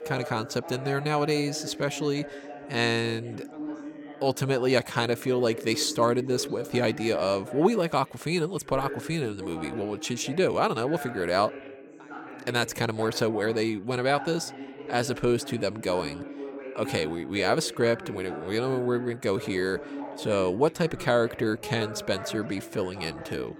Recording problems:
background chatter; noticeable; throughout; 4 voices, 10 dB below the speech

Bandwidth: 17 kHz